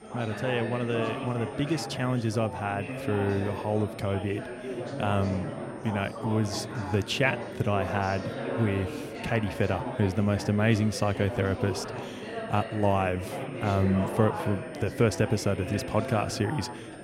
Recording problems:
chatter from many people; loud; throughout; 7 dB below the speech
high-pitched whine; faint; throughout; 9 kHz, 30 dB below the speech

